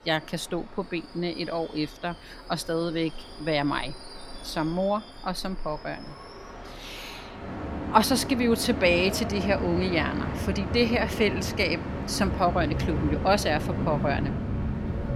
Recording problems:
train or aircraft noise; loud; throughout; 6 dB below the speech

